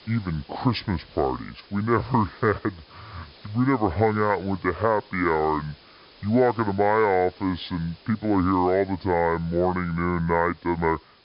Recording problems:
wrong speed and pitch; too slow and too low; 0.7 times normal speed
high frequencies cut off; noticeable; nothing above 5.5 kHz
hiss; faint; throughout; 25 dB below the speech

